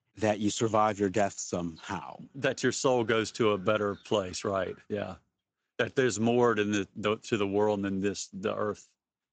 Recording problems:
garbled, watery; slightly; nothing above 7.5 kHz

